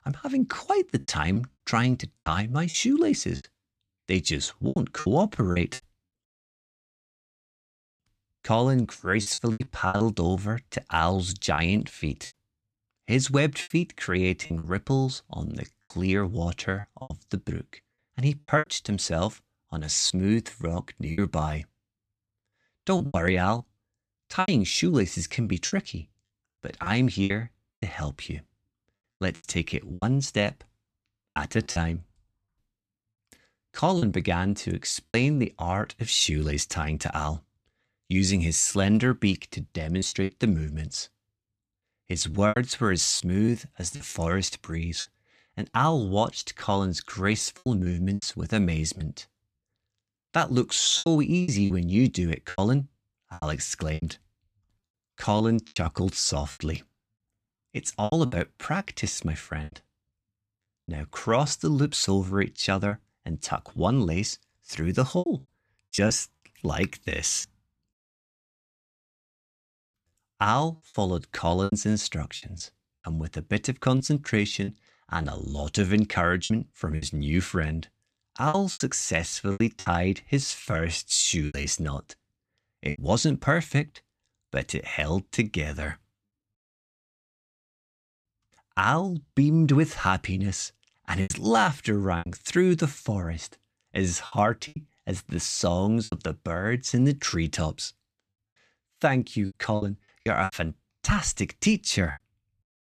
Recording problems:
choppy; very; 8% of the speech affected

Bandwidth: 14.5 kHz